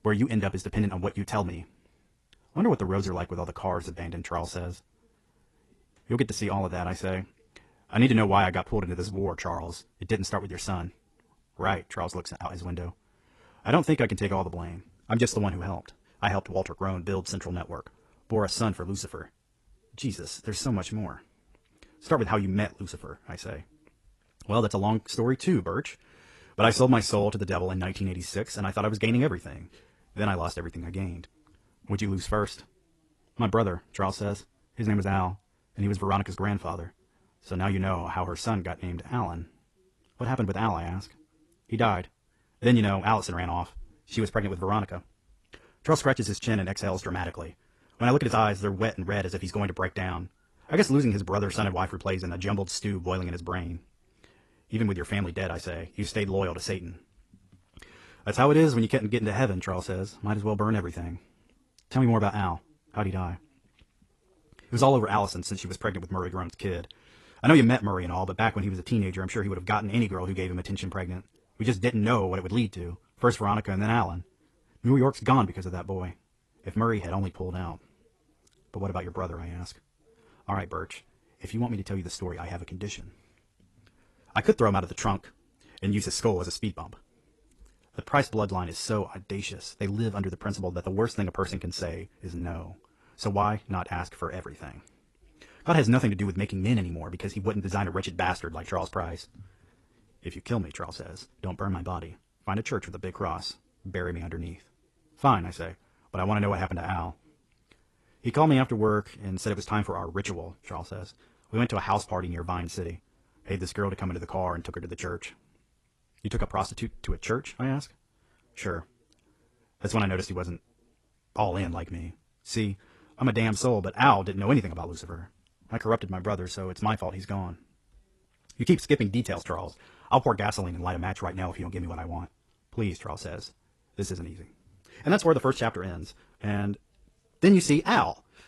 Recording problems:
wrong speed, natural pitch; too fast; 1.6 times normal speed
garbled, watery; slightly; nothing above 11.5 kHz

